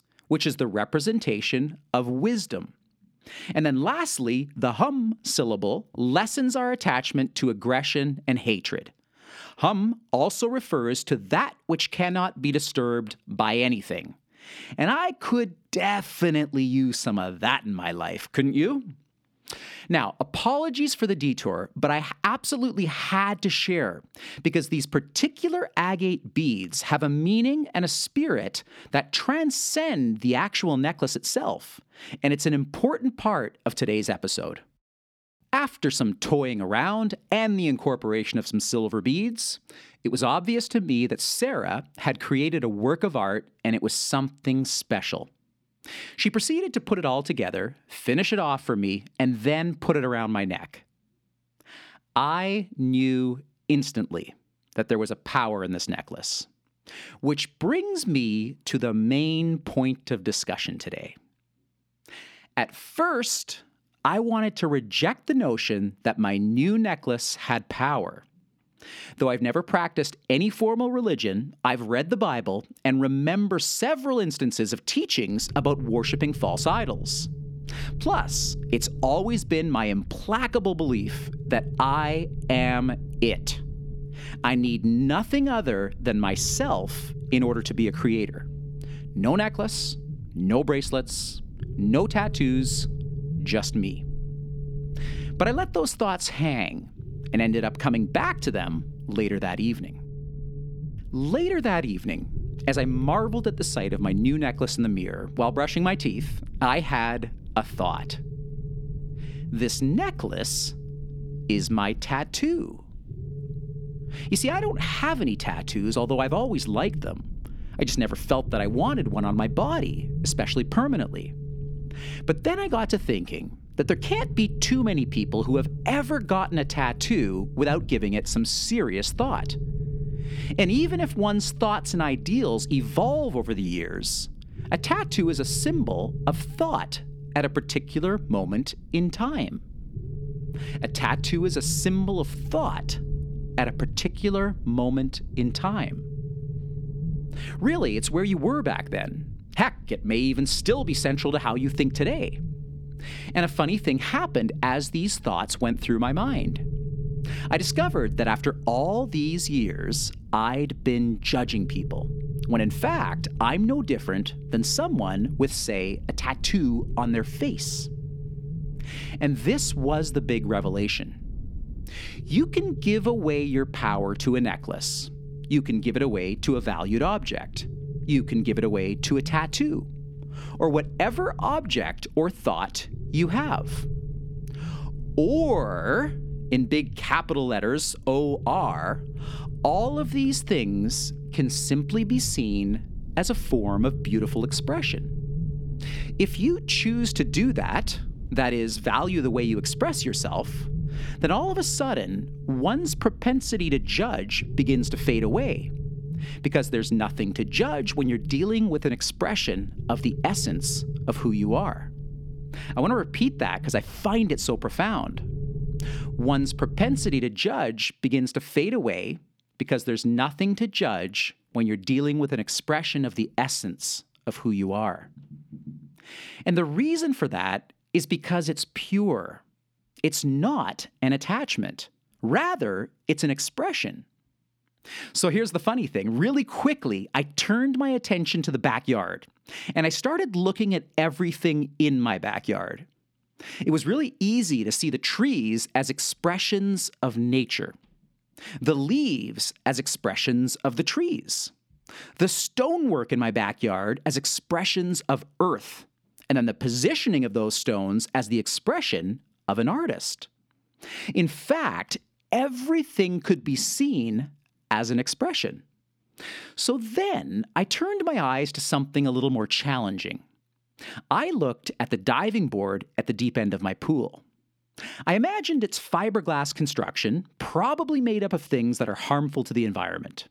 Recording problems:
low rumble; noticeable; from 1:15 to 3:37; 20 dB below the speech

